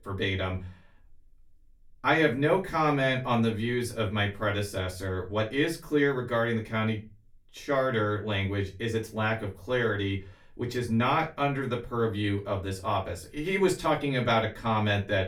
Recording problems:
off-mic speech; far
room echo; very slight; dies away in 0.2 s

